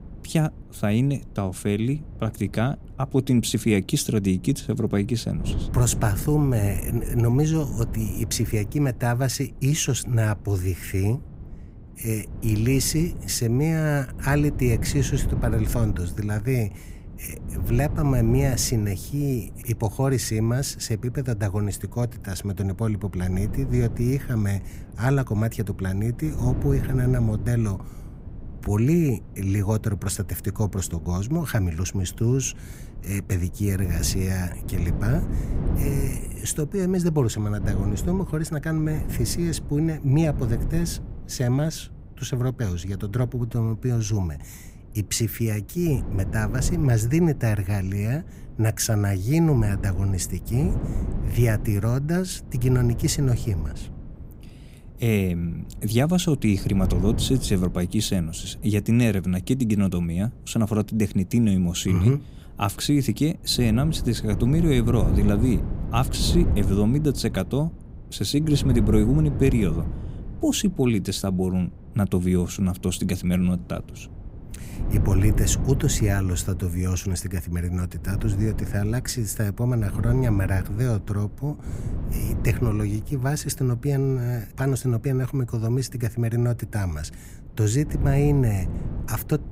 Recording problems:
wind noise on the microphone; occasional gusts; 15 dB below the speech

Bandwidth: 15.5 kHz